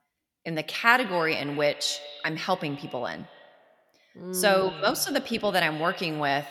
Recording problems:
echo of what is said; noticeable; throughout; 100 ms later, 15 dB below the speech

